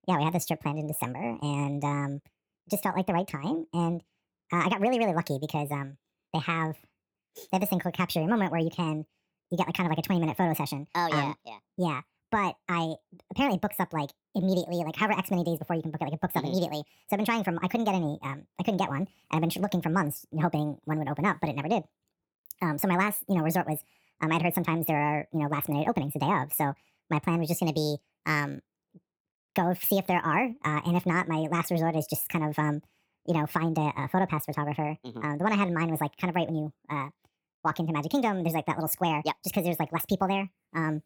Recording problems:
wrong speed and pitch; too fast and too high; 1.5 times normal speed

